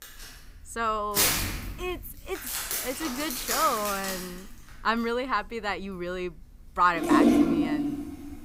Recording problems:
household noises; very loud; throughout; 3 dB above the speech

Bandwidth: 15.5 kHz